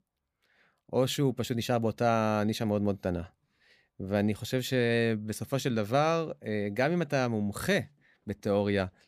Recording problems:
none

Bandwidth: 15 kHz